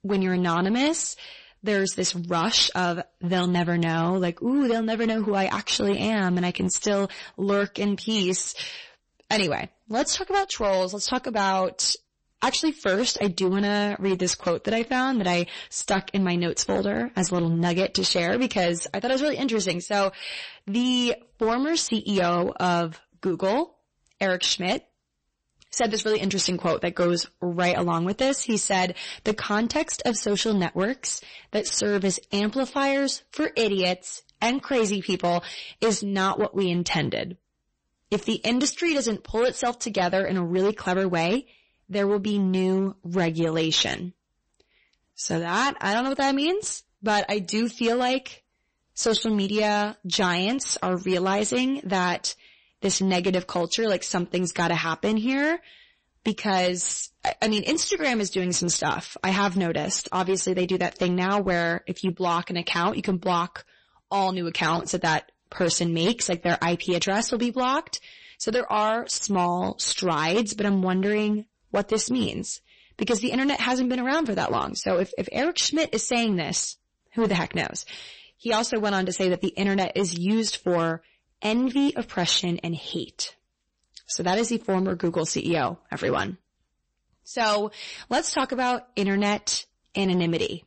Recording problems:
distortion; slight; 9% of the sound clipped
garbled, watery; slightly; nothing above 8 kHz

